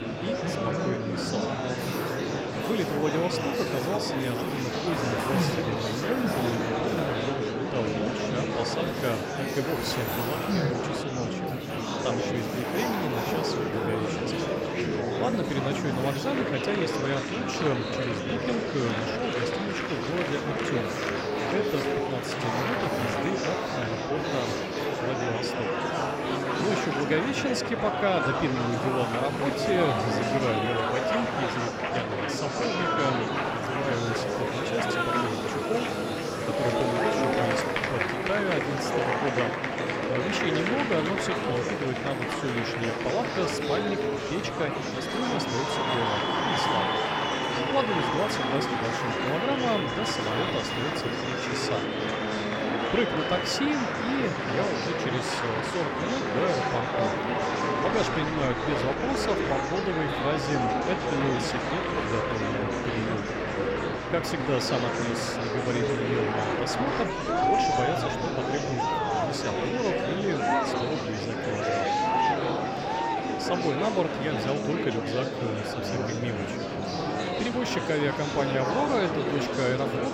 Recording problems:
murmuring crowd; very loud; throughout; 3 dB above the speech
machinery noise; noticeable; throughout; 10 dB below the speech

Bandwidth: 16 kHz